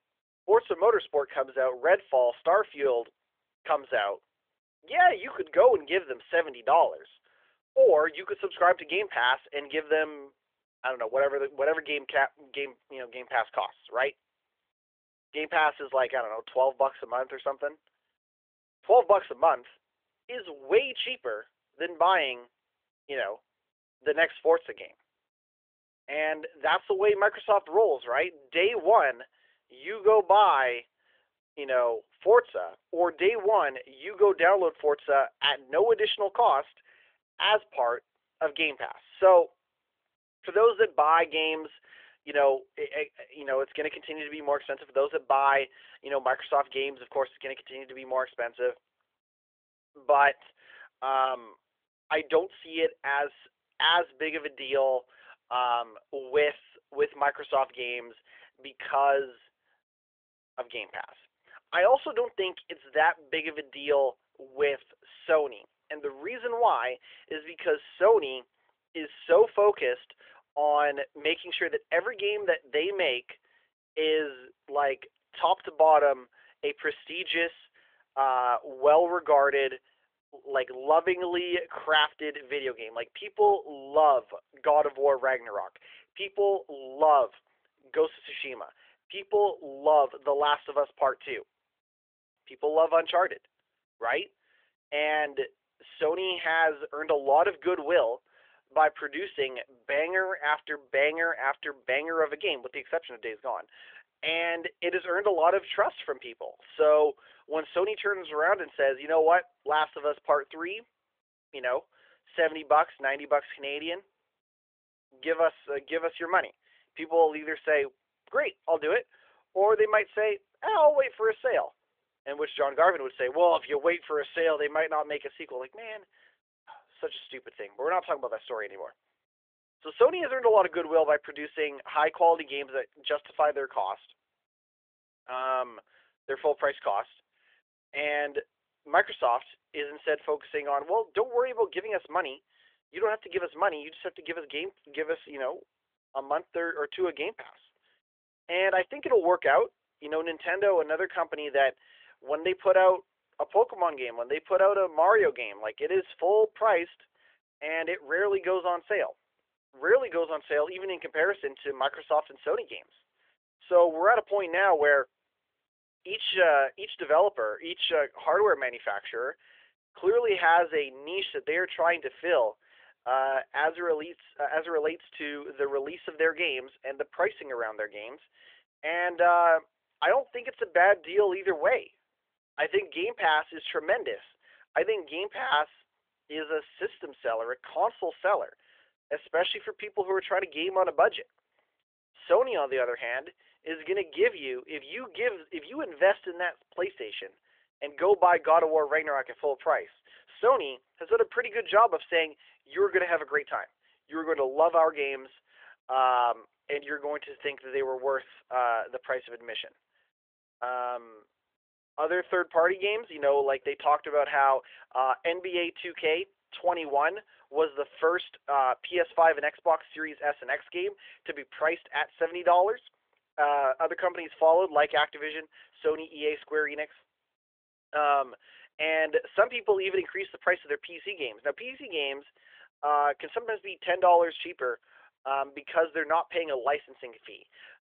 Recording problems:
phone-call audio; nothing above 3.5 kHz

